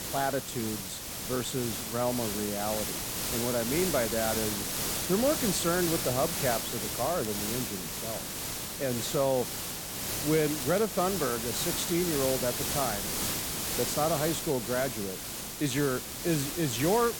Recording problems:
hiss; loud; throughout; 1 dB below the speech
crackle, like an old record; very faint; 20 dB below the speech

